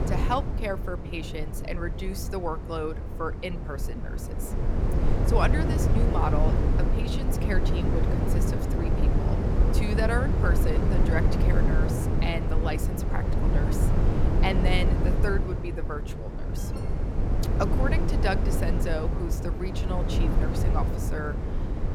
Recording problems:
low rumble; loud; throughout; 2 dB below the speech
alarm; faint; at 17 s; peak 15 dB below the speech

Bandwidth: 17 kHz